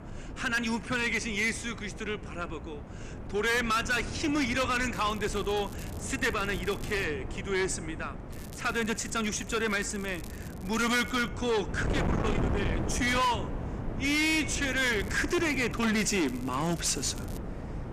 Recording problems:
distortion; heavy; 7 dB below the speech
wind noise on the microphone; occasional gusts; 15 dB below the speech
crackling; faint; from 5 to 7 s, from 8.5 to 11 s and from 15 to 17 s; 20 dB below the speech

